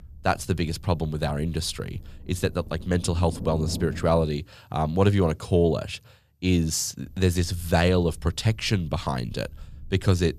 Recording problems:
low rumble; noticeable; until 4 s and from 7 s on; 15 dB below the speech

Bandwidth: 13.5 kHz